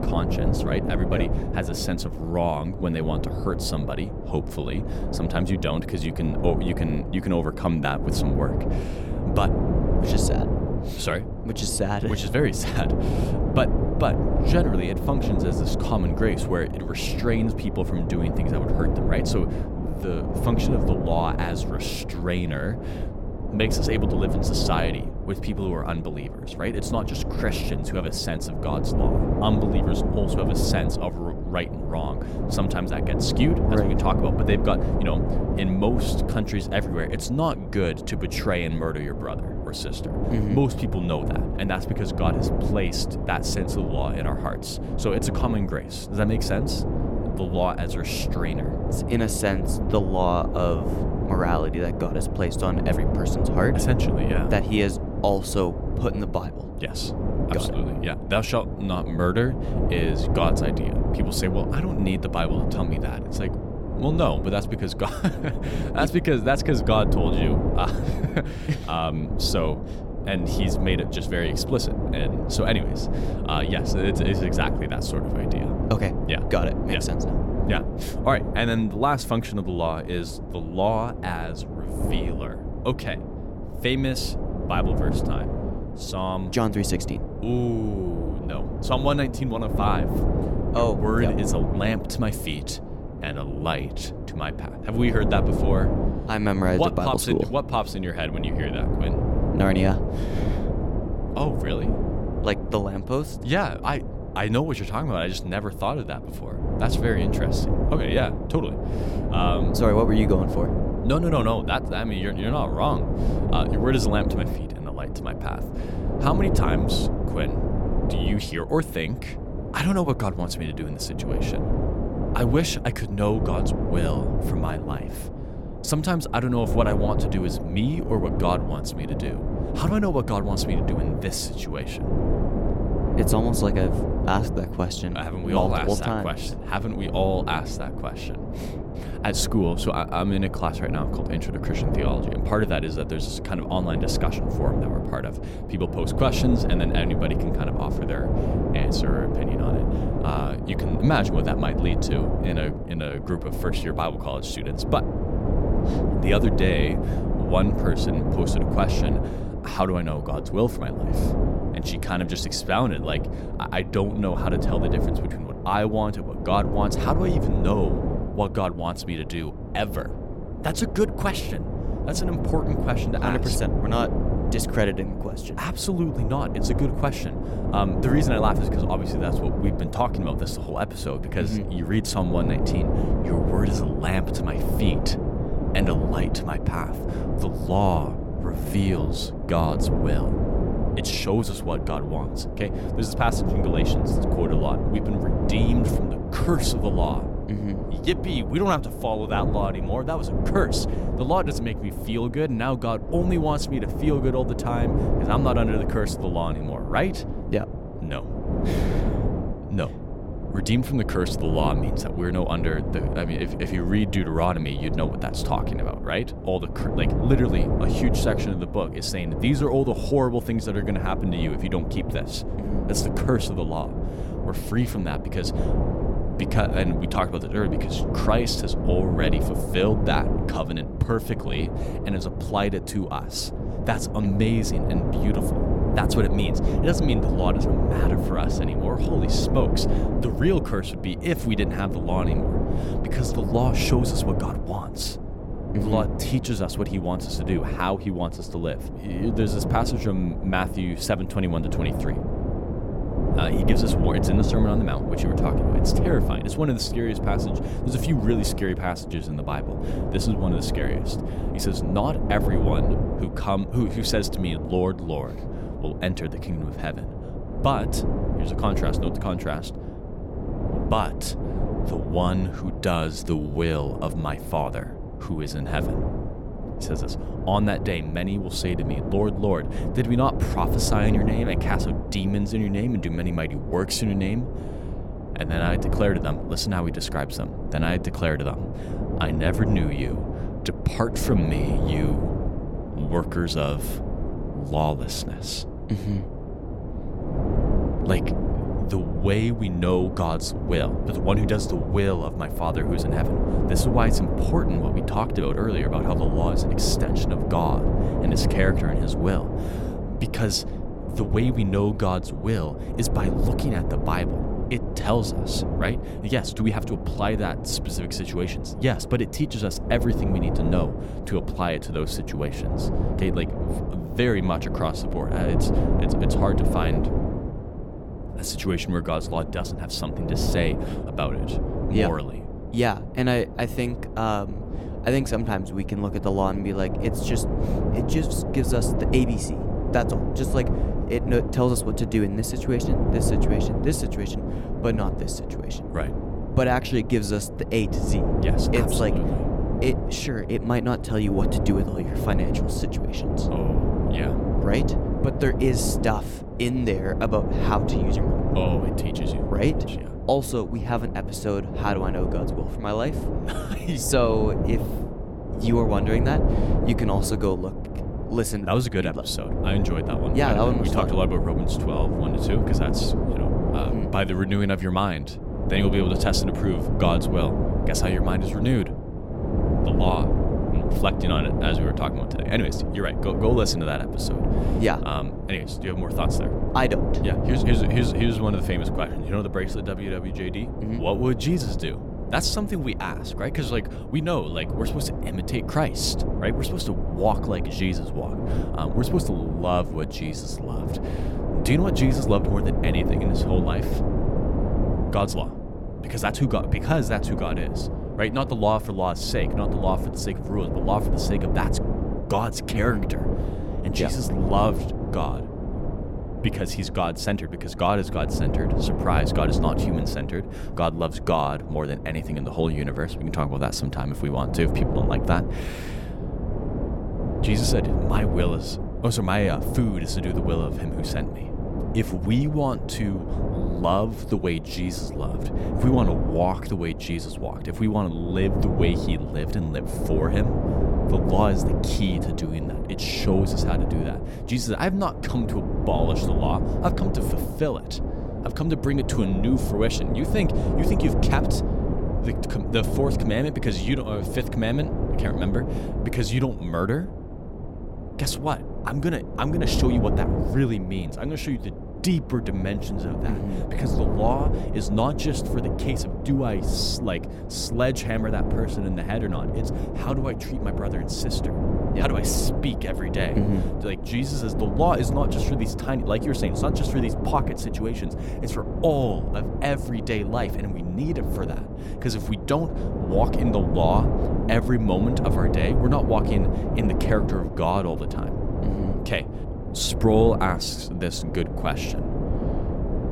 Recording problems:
wind noise on the microphone; heavy; 5 dB below the speech

